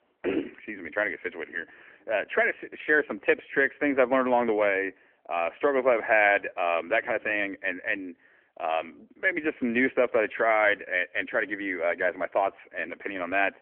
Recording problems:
phone-call audio

